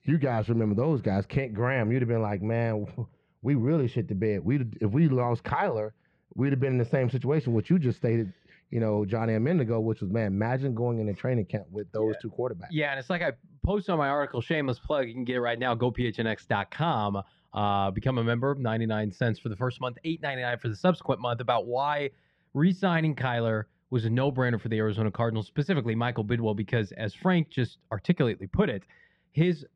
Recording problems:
muffled; slightly; fading above 2.5 kHz

